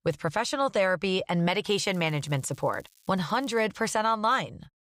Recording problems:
crackling; faint; from 1.5 to 3.5 s; 30 dB below the speech

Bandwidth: 15.5 kHz